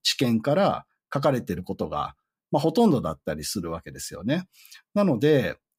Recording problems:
none

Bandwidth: 15.5 kHz